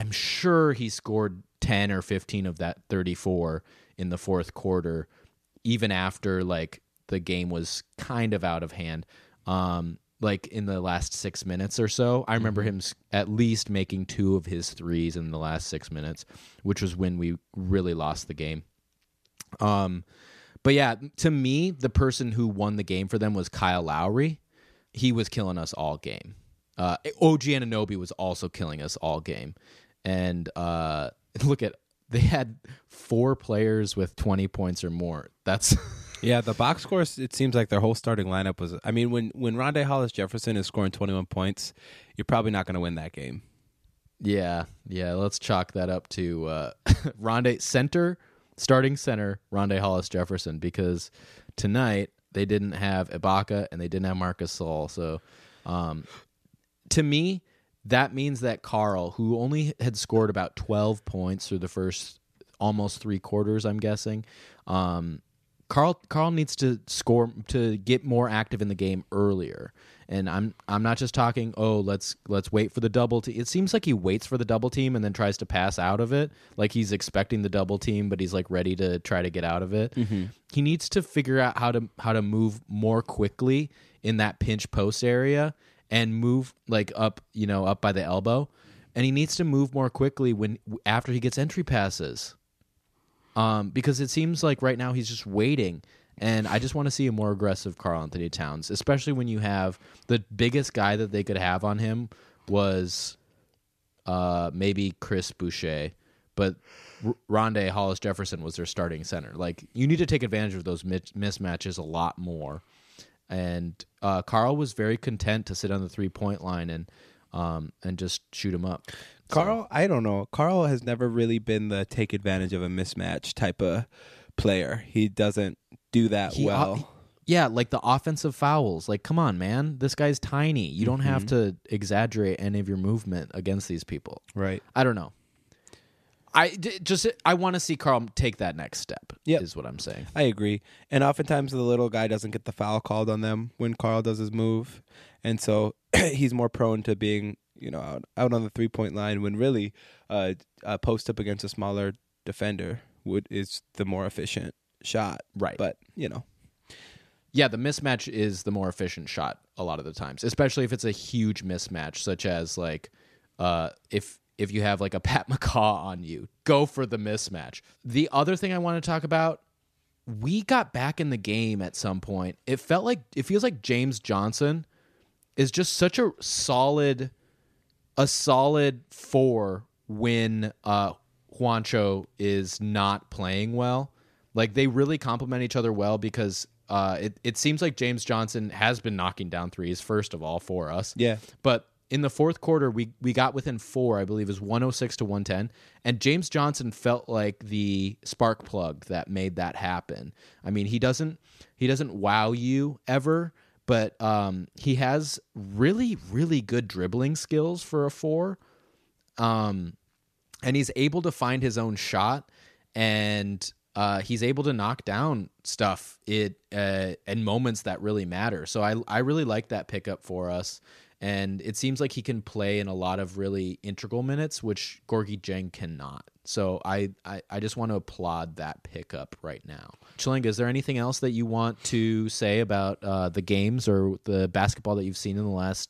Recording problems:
abrupt cut into speech; at the start

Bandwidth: 14.5 kHz